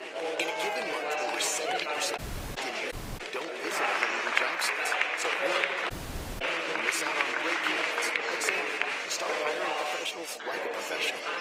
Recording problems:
thin; very; fading below 450 Hz
garbled, watery; slightly; nothing above 15.5 kHz
chatter from many people; very loud; throughout; 7 dB above the speech
audio cutting out; at 2 s, at 3 s and at 6 s for 0.5 s

